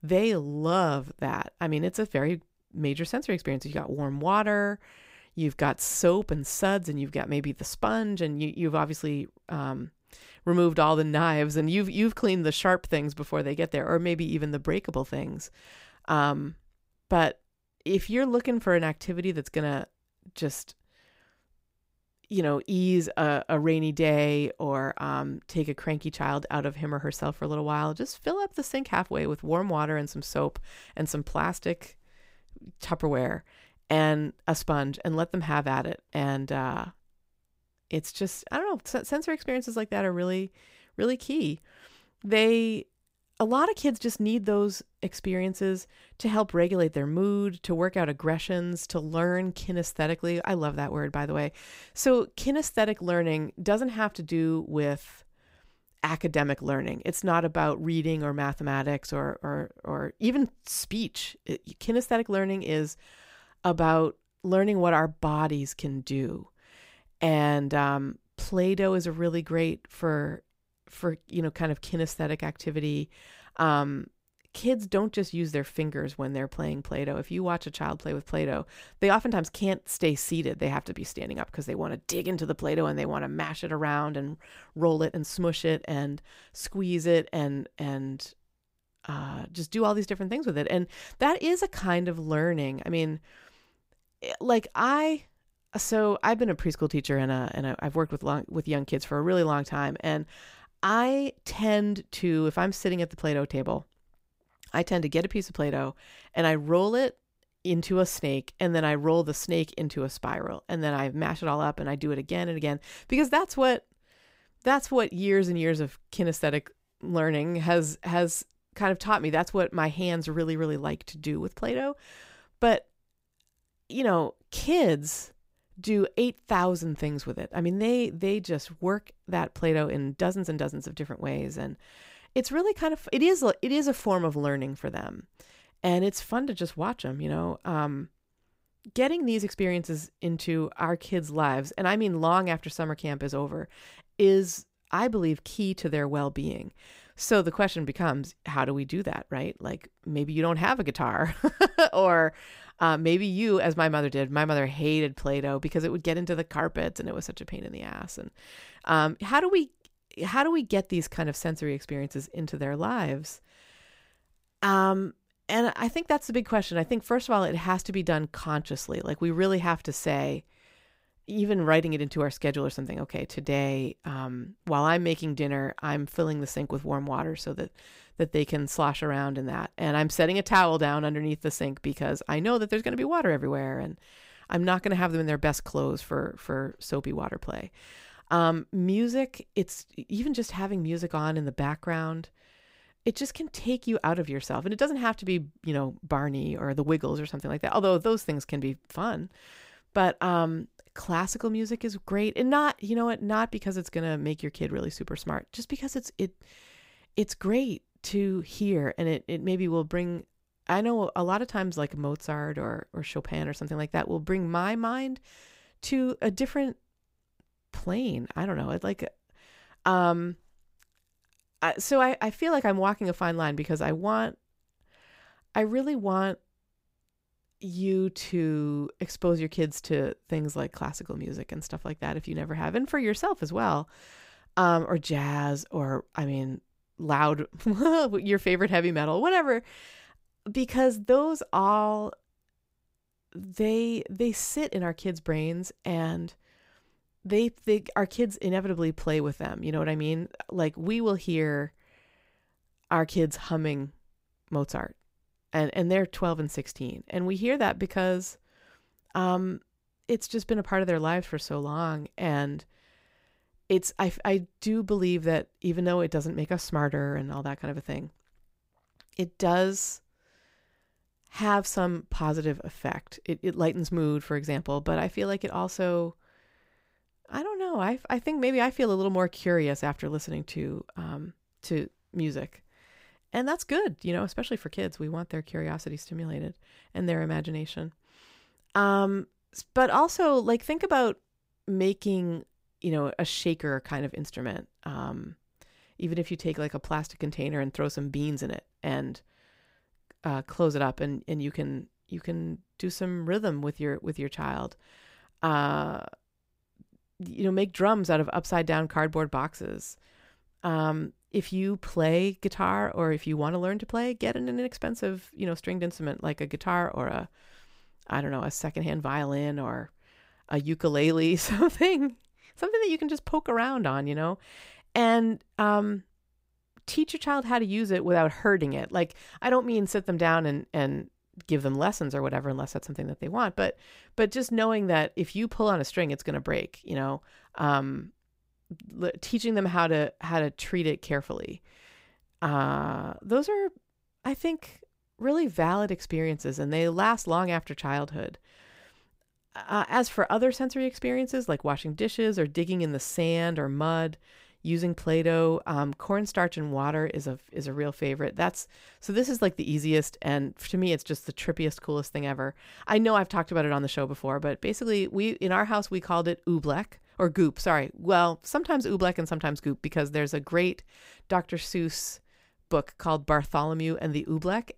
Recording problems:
uneven, jittery; strongly; from 18 s to 3:51

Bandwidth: 15.5 kHz